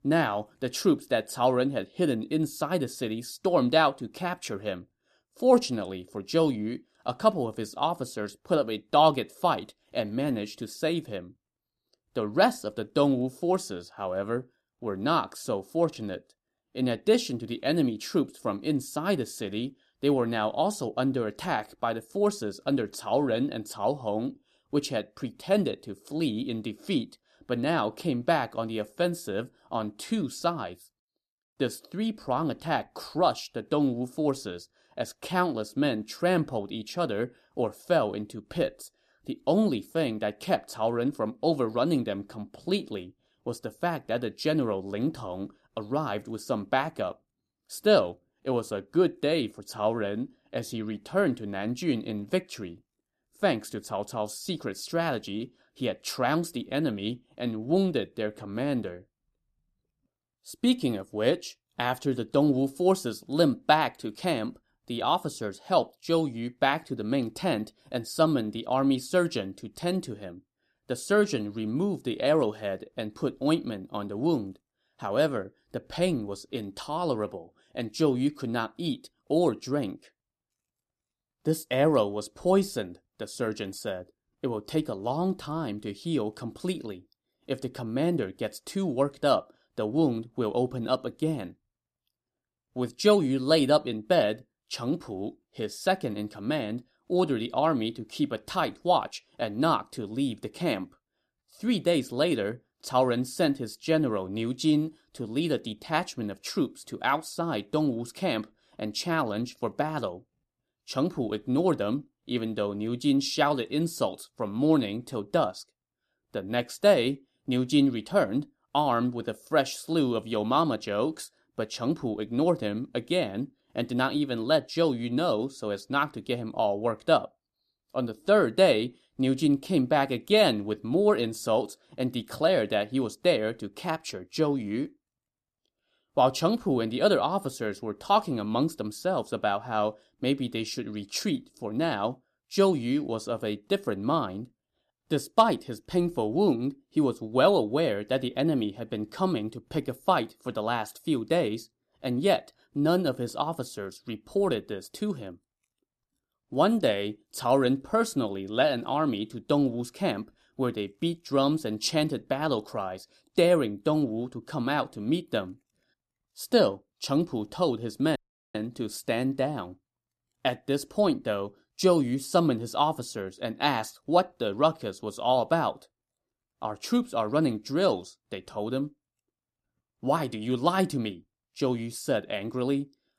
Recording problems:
audio cutting out; at 2:48

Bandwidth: 14 kHz